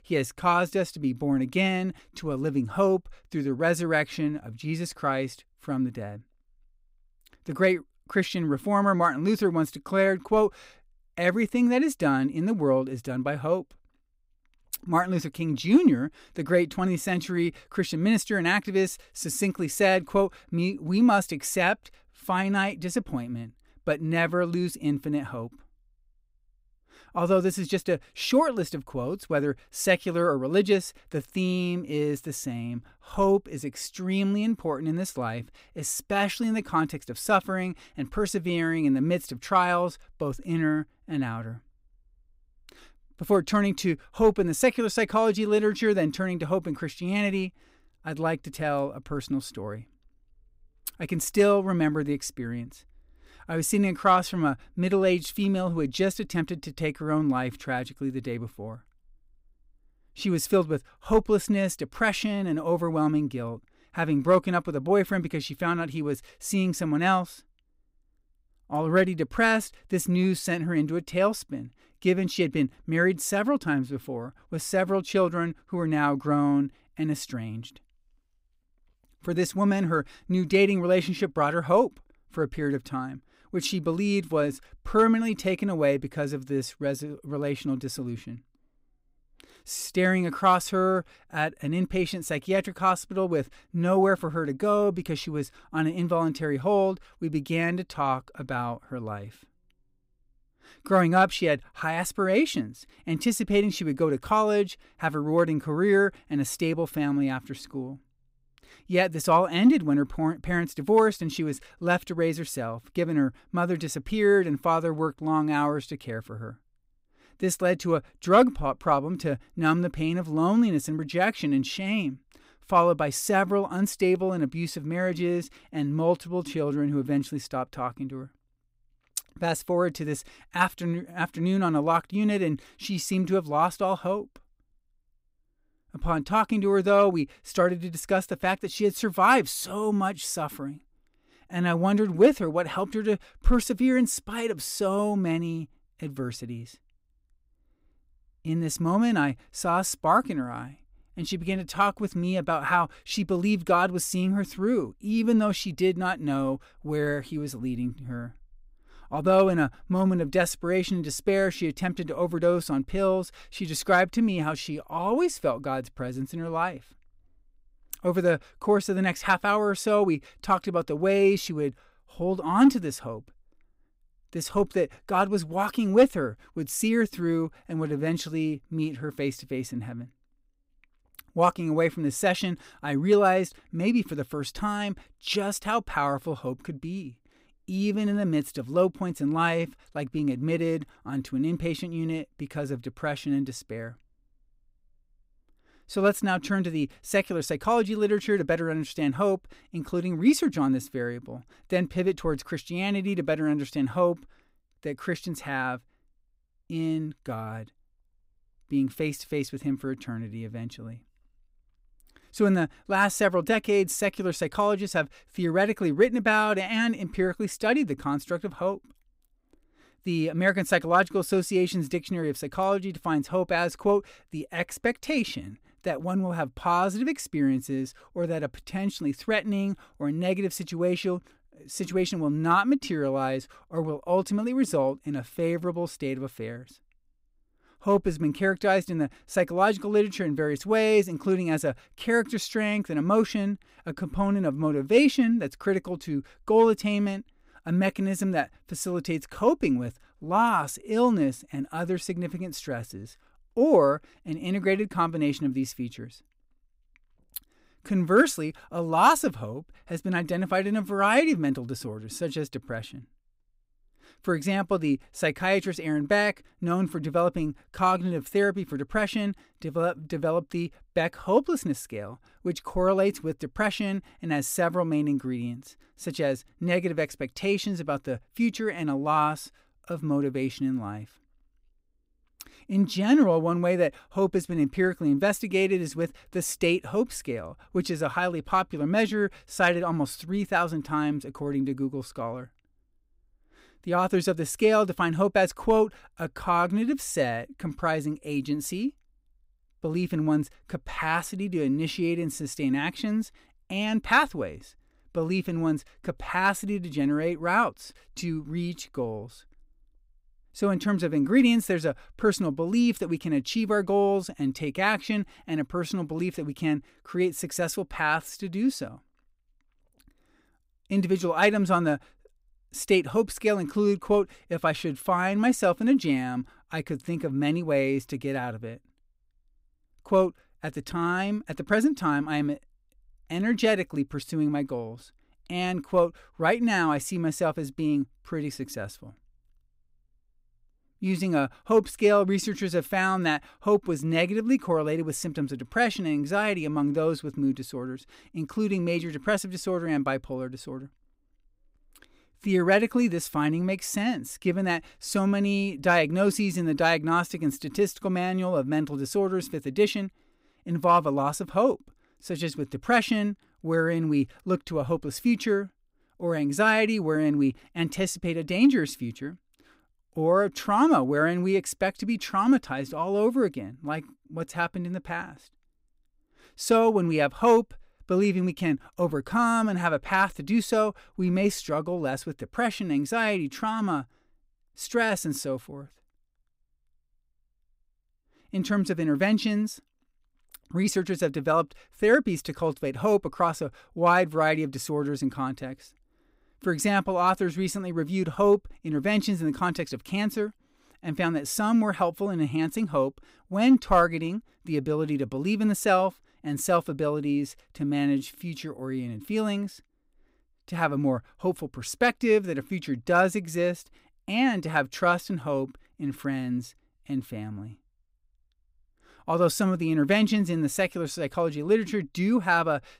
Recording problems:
none

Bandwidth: 15.5 kHz